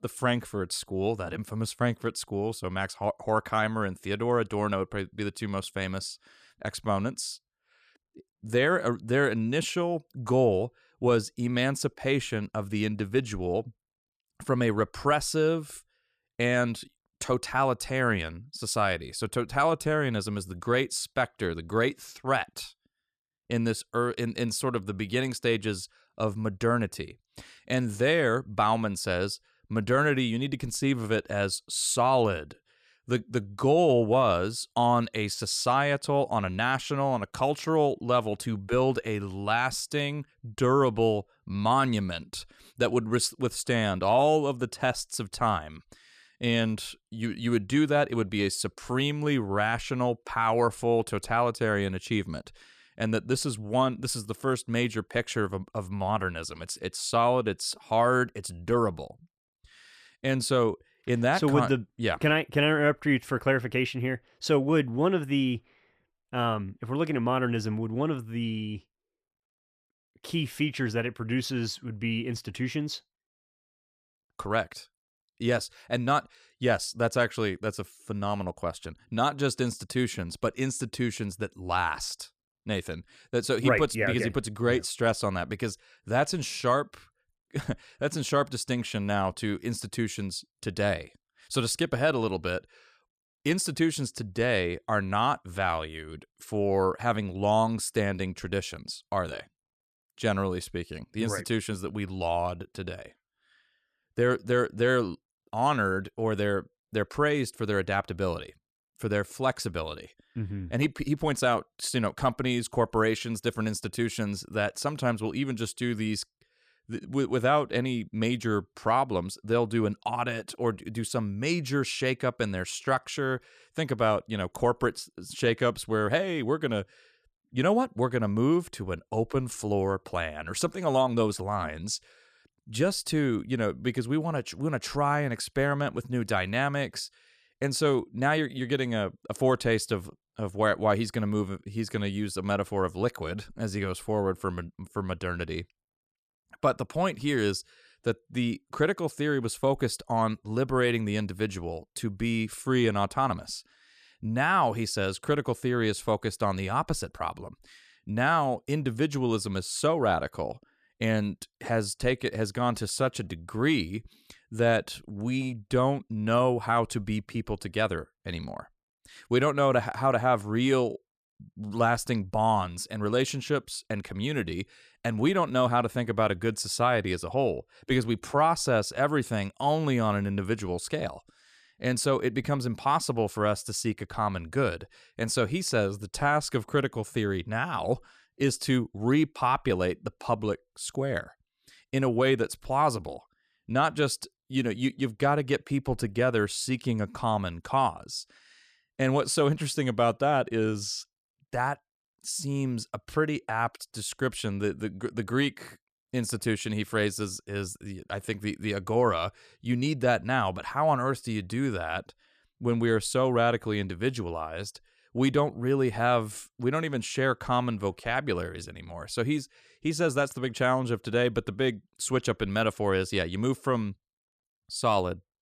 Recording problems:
none

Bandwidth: 14.5 kHz